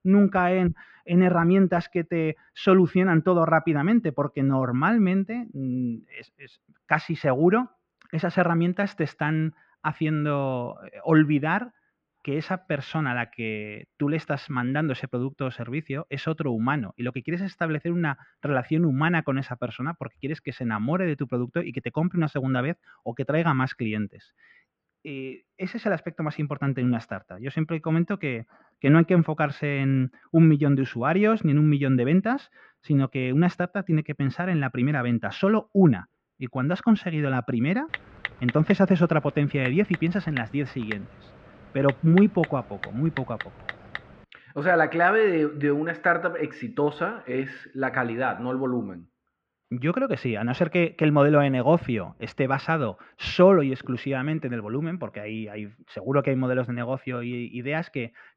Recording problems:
muffled; very; fading above 2.5 kHz
keyboard typing; noticeable; from 38 to 44 s; peak 8 dB below the speech

